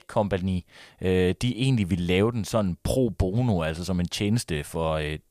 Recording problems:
none

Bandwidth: 15 kHz